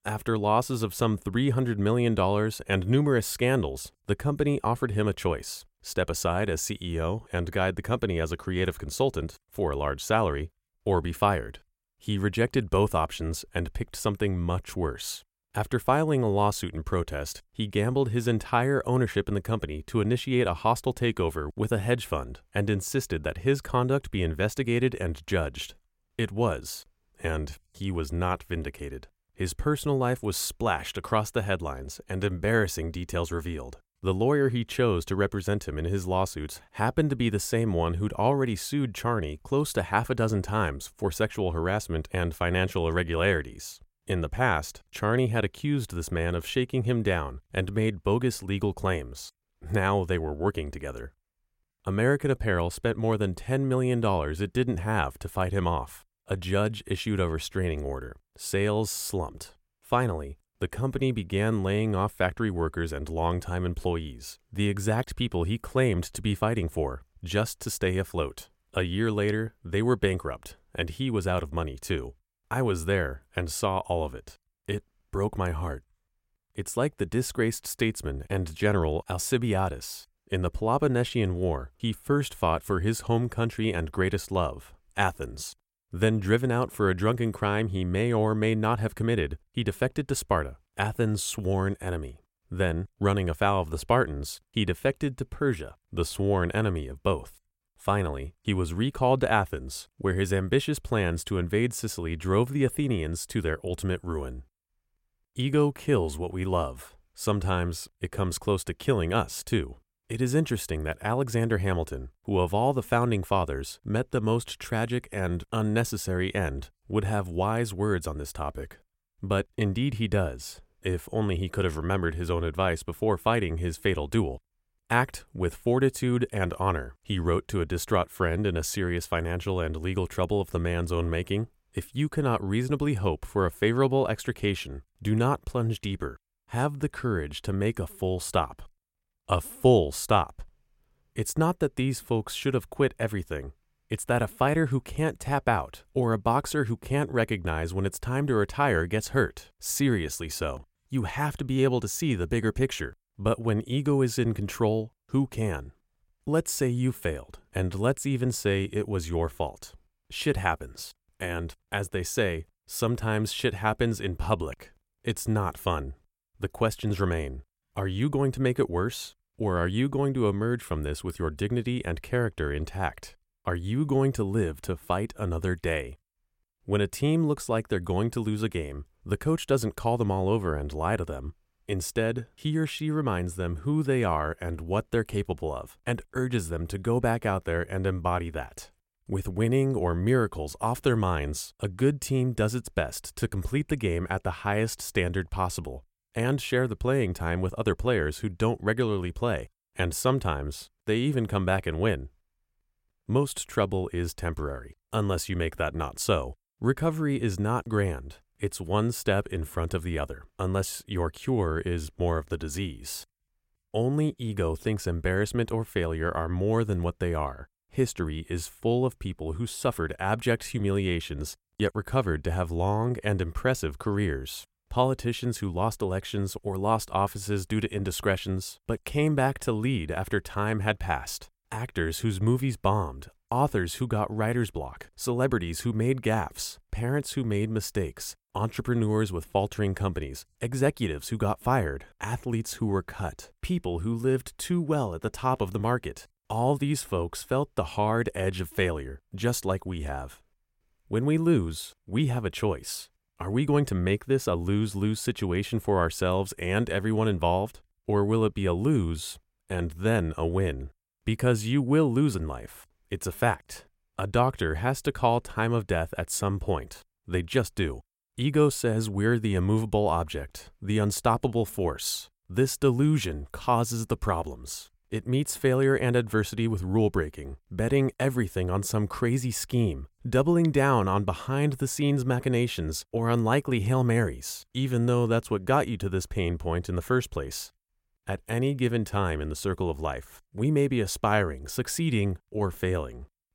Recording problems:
none

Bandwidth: 16.5 kHz